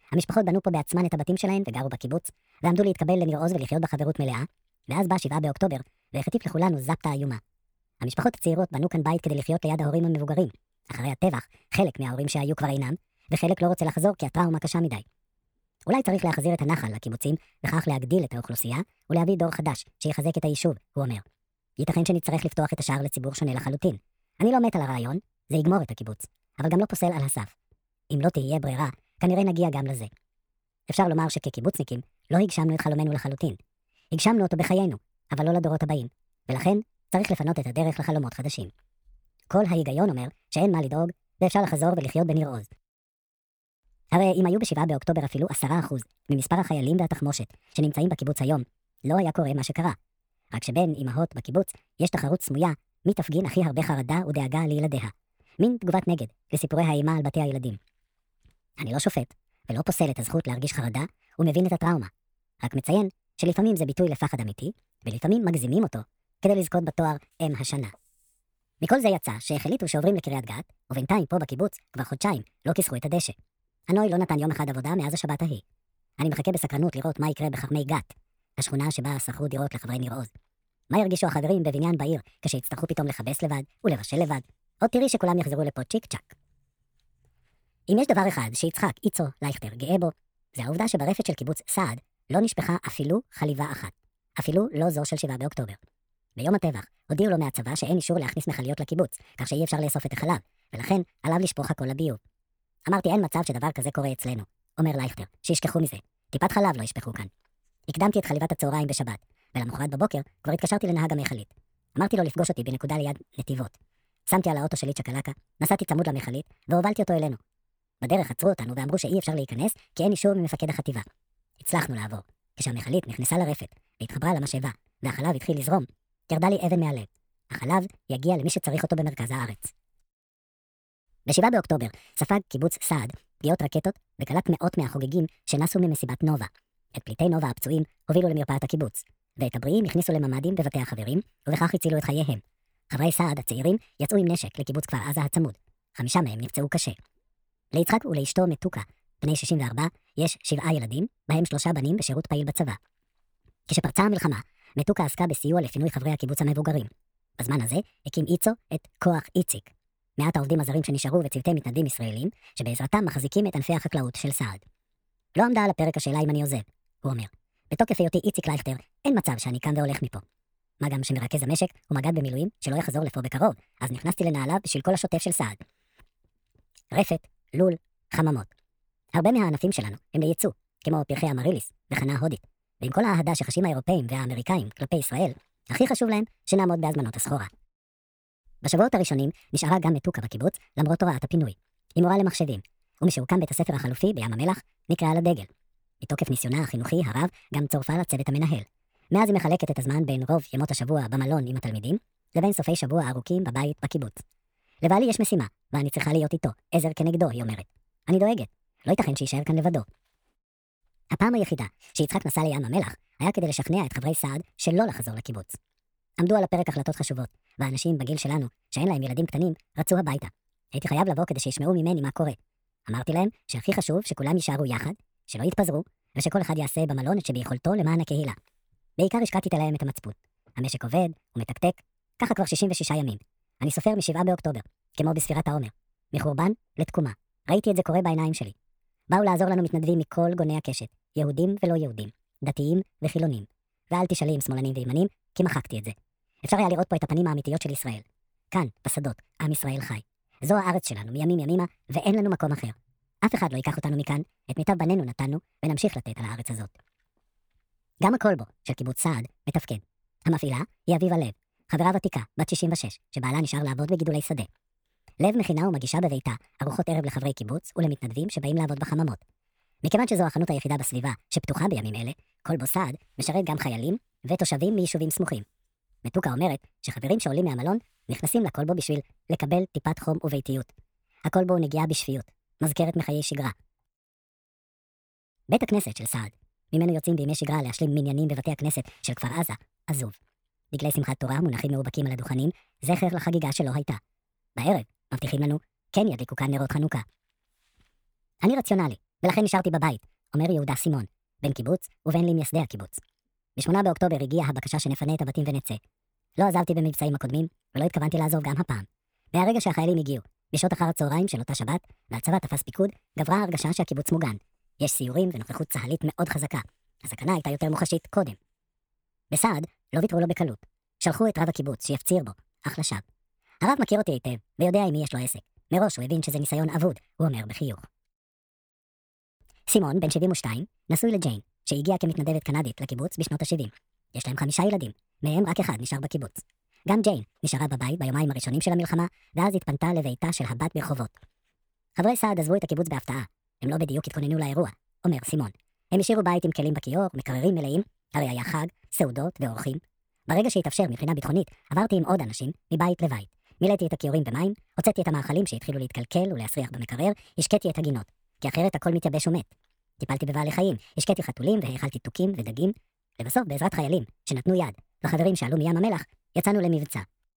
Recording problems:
wrong speed and pitch; too fast and too high; 1.5 times normal speed

